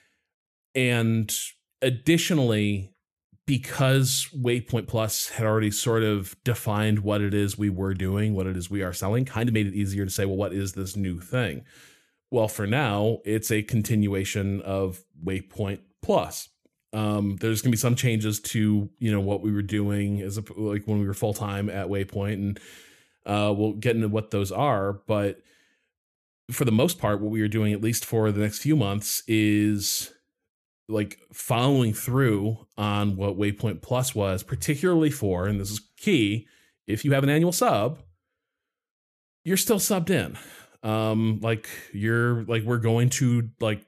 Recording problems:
uneven, jittery; strongly; from 4.5 to 38 s

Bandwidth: 14 kHz